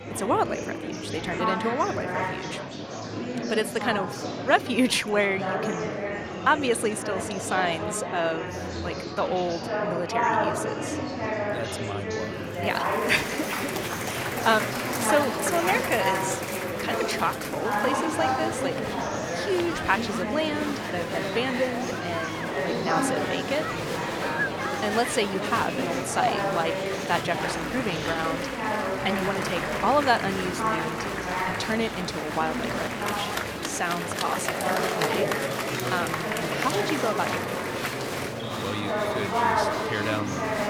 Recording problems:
murmuring crowd; very loud; throughout; as loud as the speech

